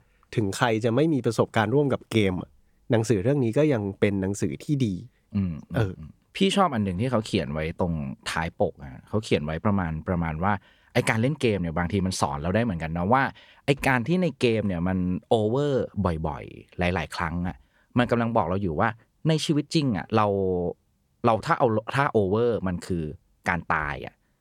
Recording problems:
none

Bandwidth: 18 kHz